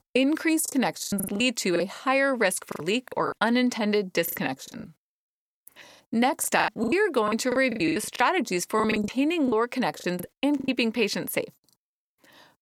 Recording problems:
choppy; very; 15% of the speech affected

